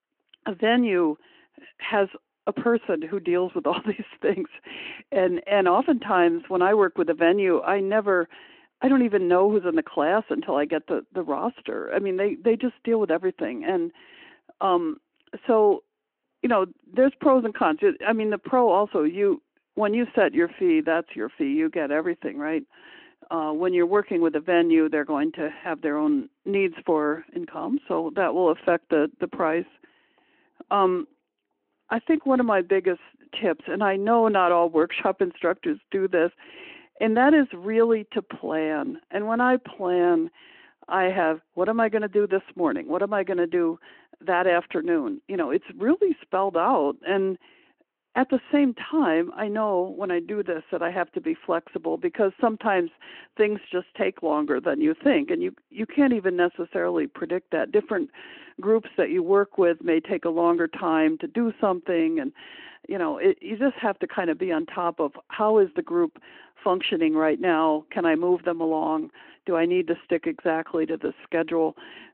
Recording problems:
phone-call audio

